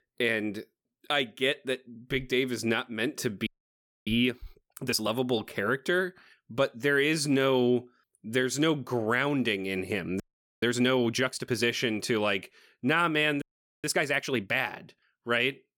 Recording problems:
audio freezing; at 3.5 s for 0.5 s, at 10 s and at 13 s

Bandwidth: 18 kHz